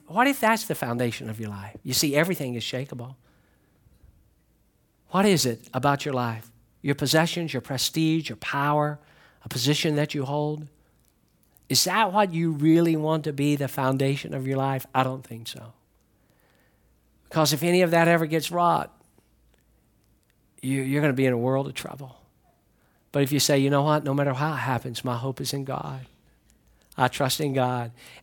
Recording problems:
none

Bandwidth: 17.5 kHz